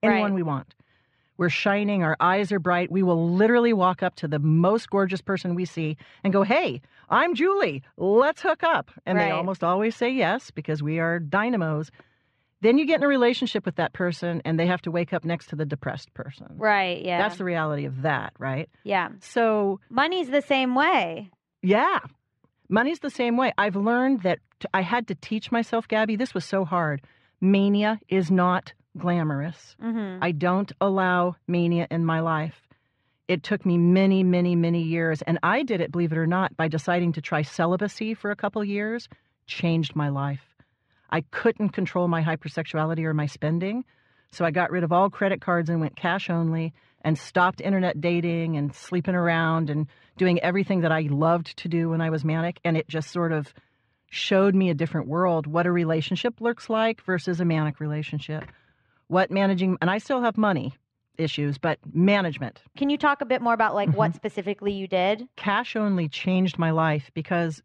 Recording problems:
muffled; slightly; fading above 3 kHz

